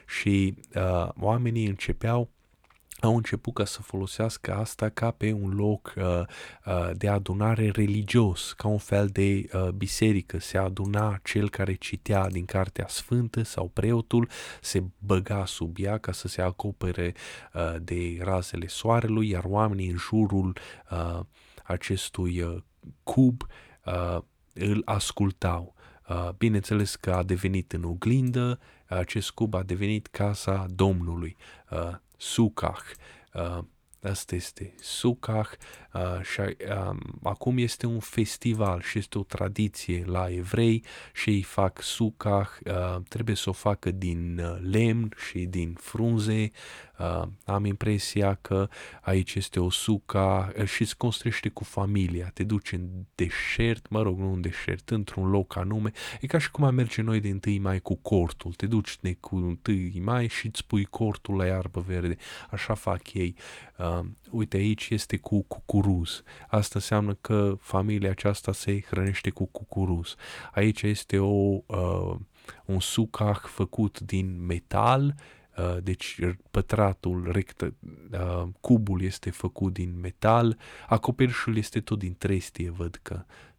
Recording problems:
none

